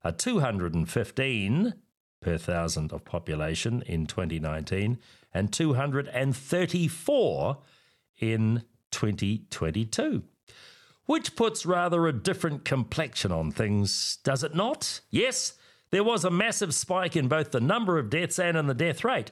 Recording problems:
none

